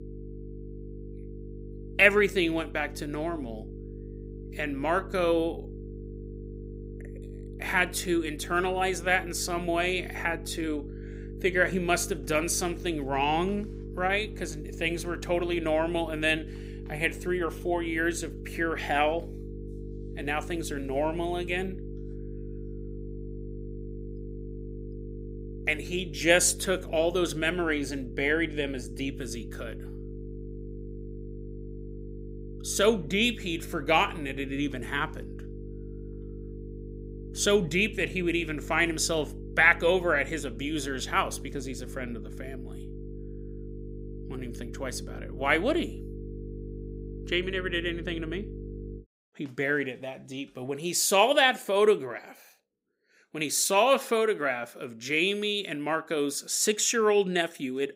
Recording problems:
electrical hum; noticeable; until 49 s; 50 Hz, 20 dB below the speech

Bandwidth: 15.5 kHz